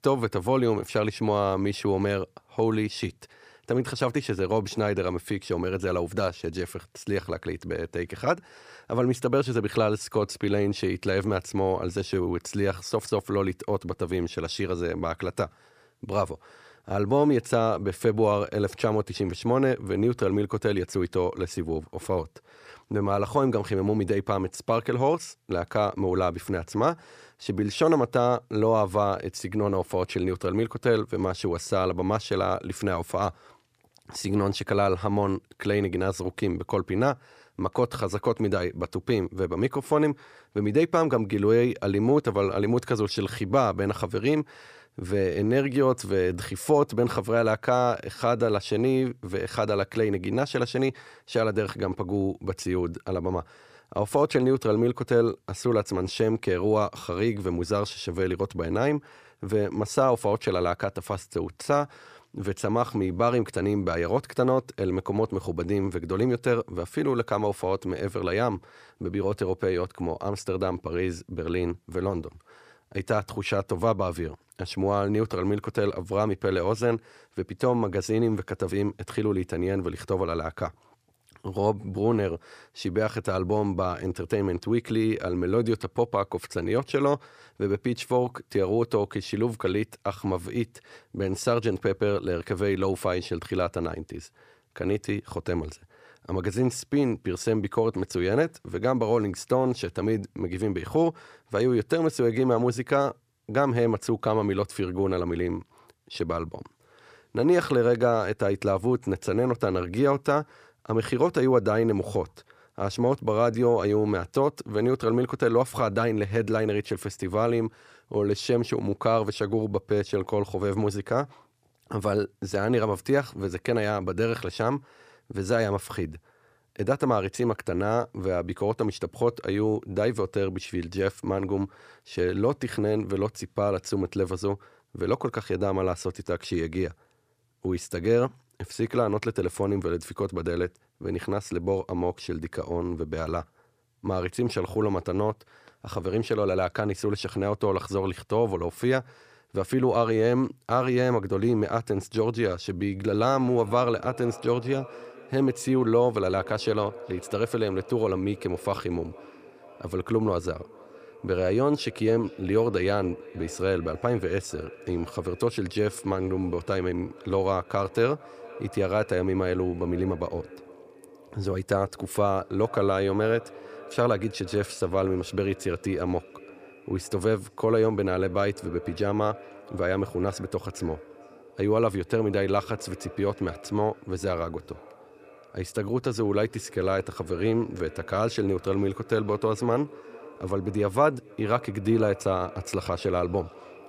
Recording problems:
echo of what is said; faint; from 2:33 on; 450 ms later, 20 dB below the speech

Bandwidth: 15 kHz